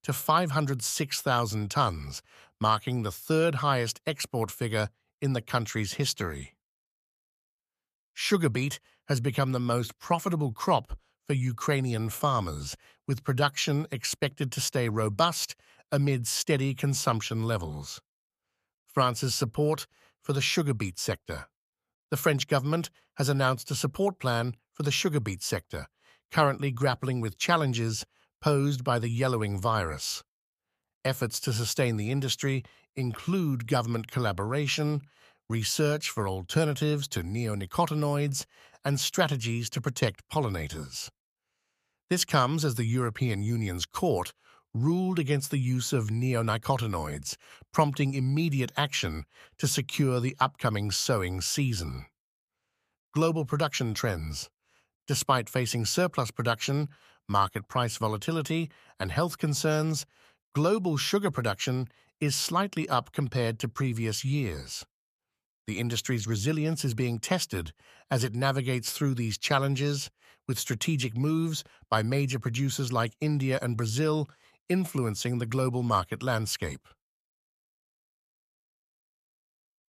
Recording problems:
none

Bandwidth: 14.5 kHz